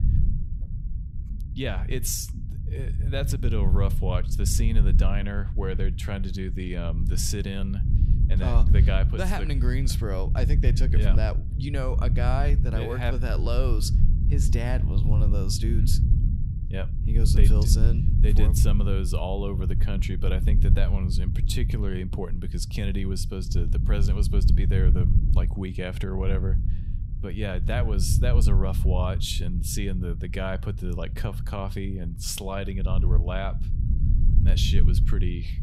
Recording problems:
low rumble; loud; throughout; 8 dB below the speech

